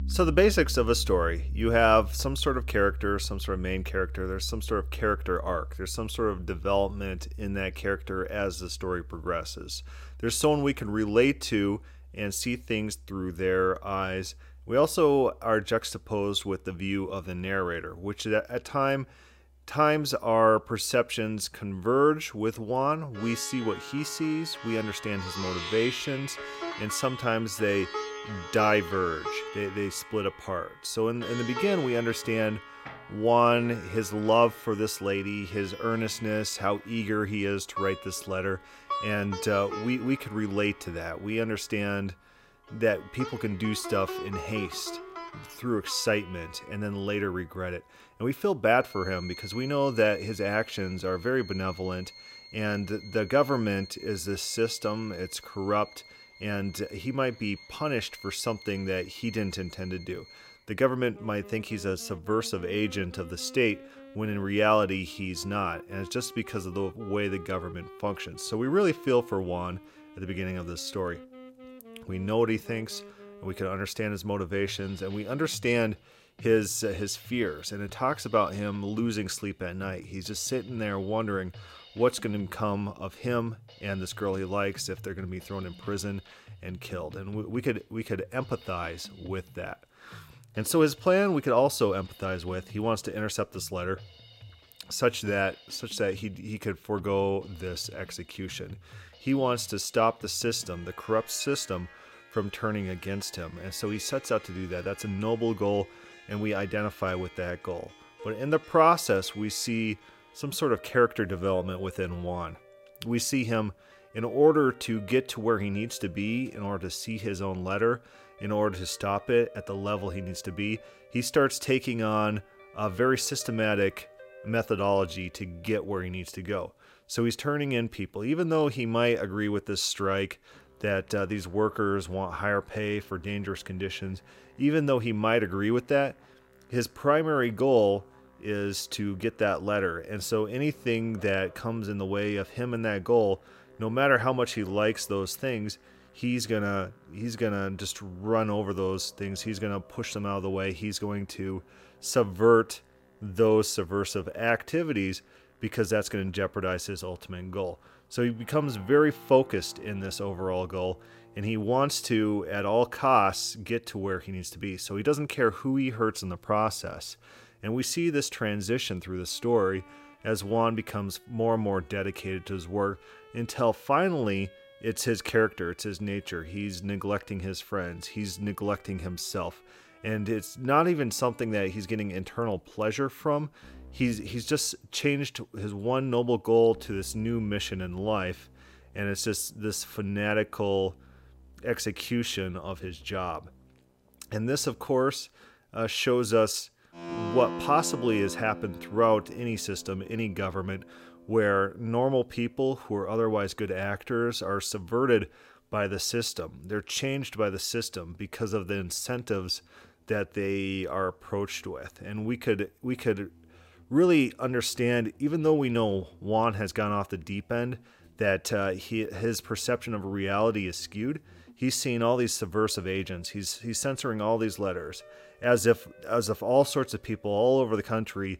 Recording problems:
background music; noticeable; throughout; 15 dB below the speech

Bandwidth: 16 kHz